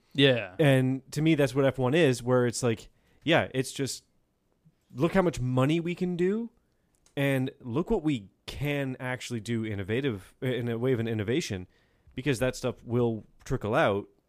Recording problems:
none

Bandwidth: 15 kHz